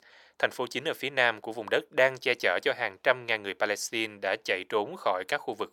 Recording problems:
thin; very; fading below 750 Hz

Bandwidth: 17.5 kHz